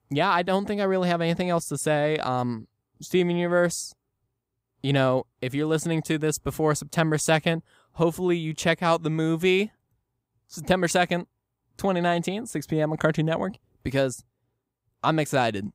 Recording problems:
none

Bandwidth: 15.5 kHz